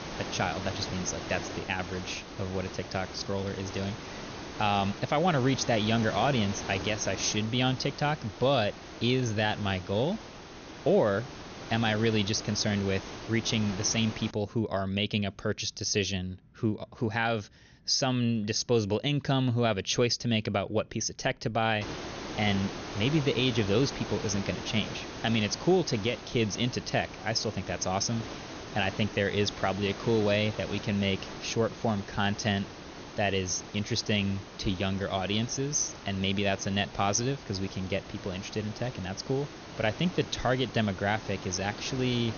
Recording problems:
high frequencies cut off; noticeable; nothing above 6.5 kHz
hiss; noticeable; until 14 s and from 22 s on; 10 dB below the speech

